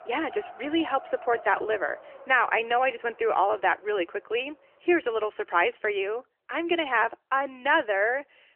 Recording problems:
phone-call audio; nothing above 3 kHz
wind in the background; noticeable; throughout; 20 dB below the speech

